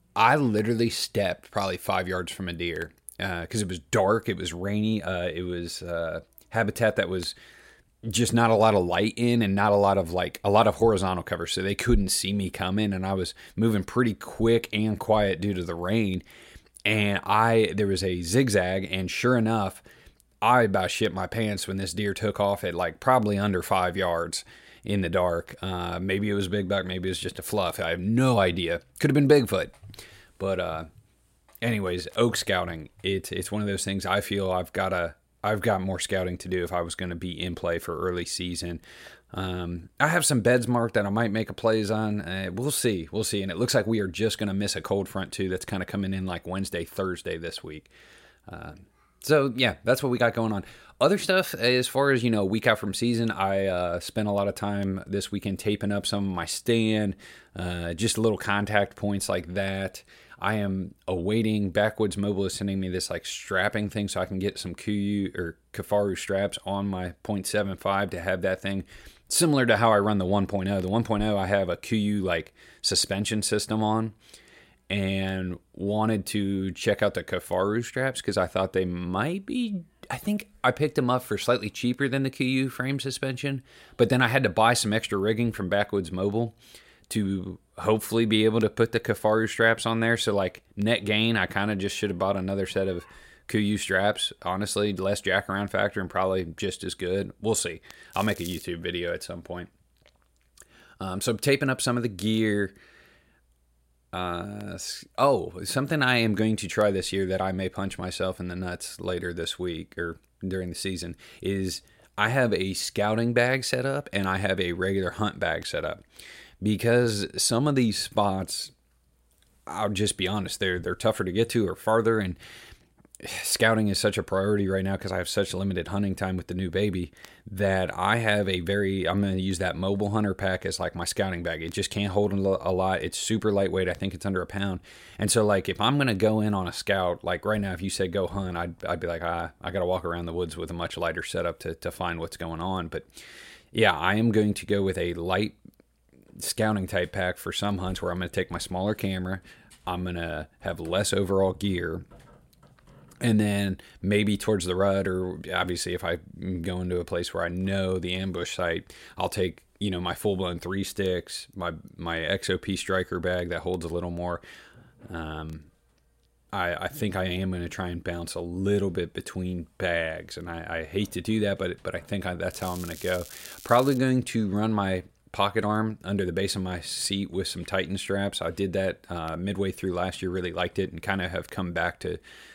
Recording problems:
crackling; noticeable; at 1:38 and from 2:53 to 2:54; 15 dB below the speech

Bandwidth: 16 kHz